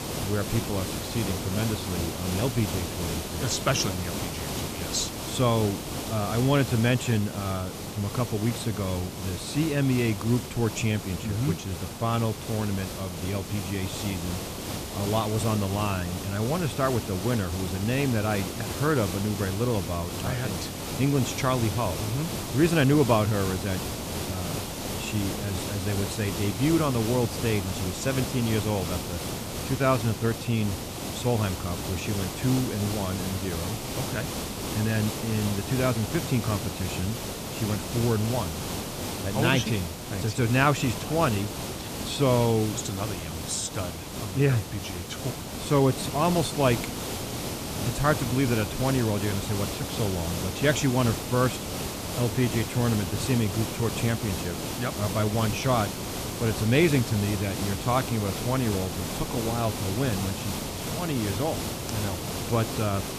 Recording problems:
hiss; loud; throughout; 5 dB below the speech

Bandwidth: 14.5 kHz